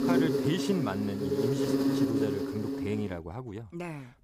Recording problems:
animal sounds; very loud; throughout; 5 dB above the speech

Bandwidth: 15.5 kHz